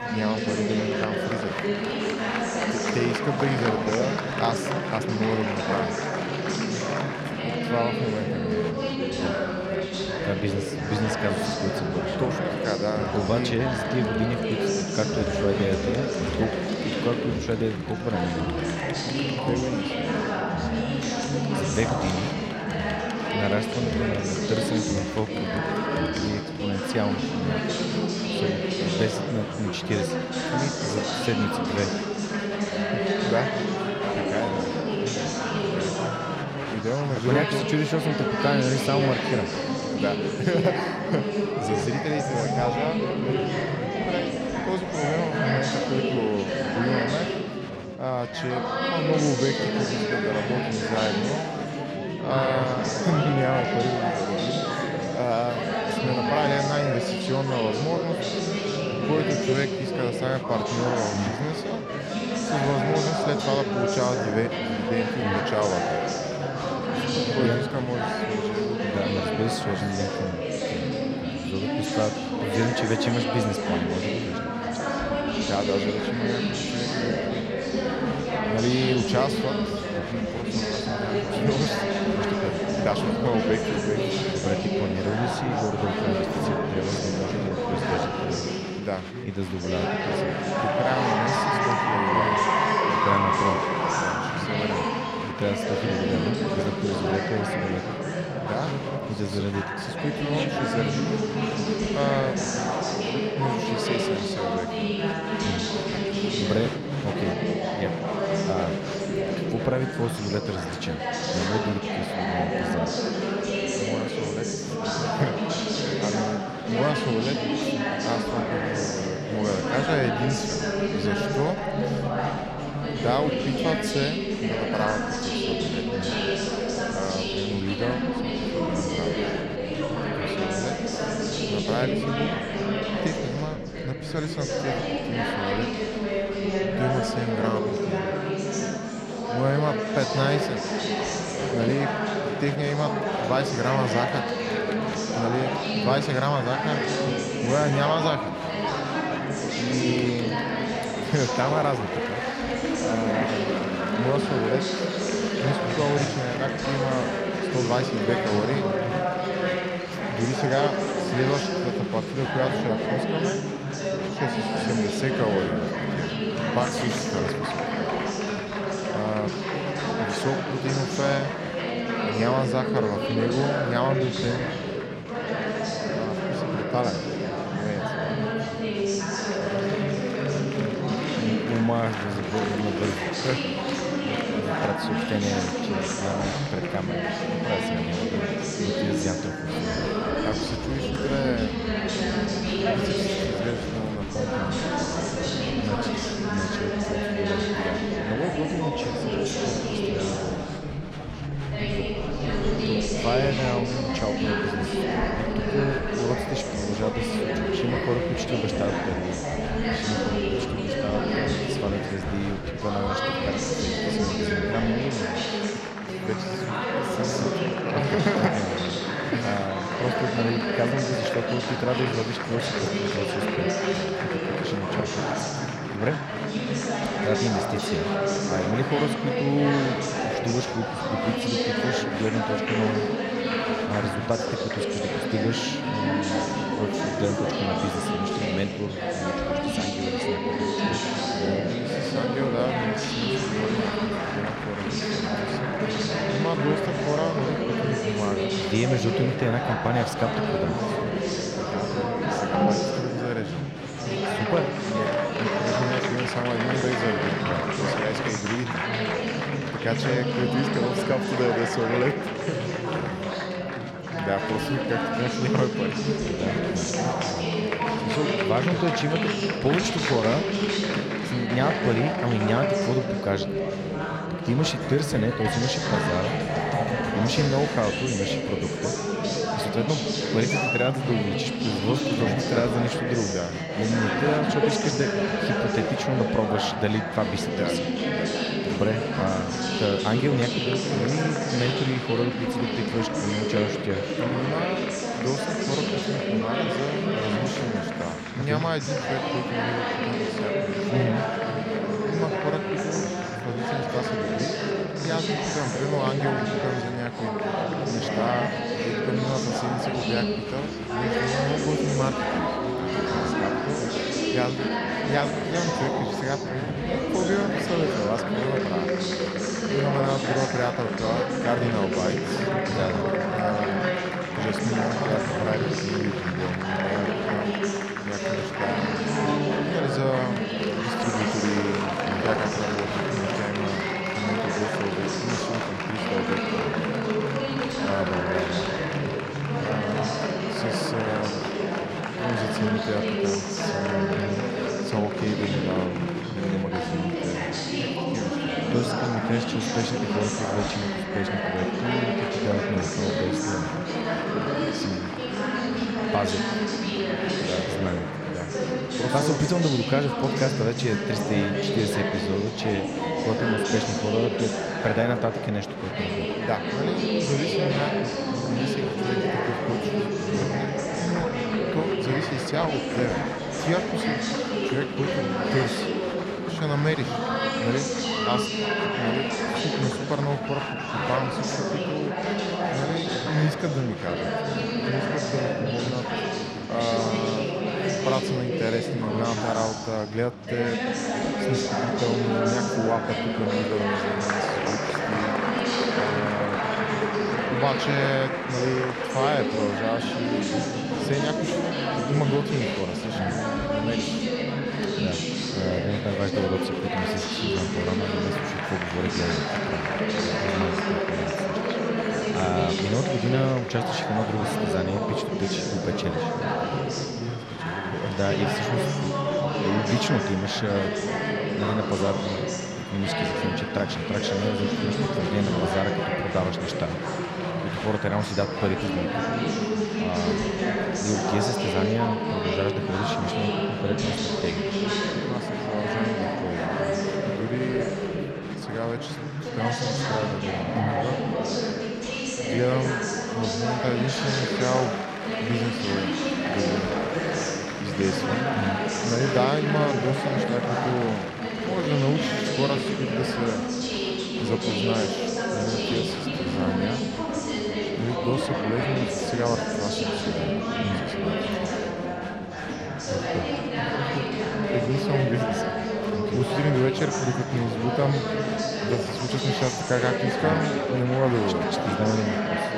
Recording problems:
chatter from many people; very loud; throughout; 3 dB above the speech

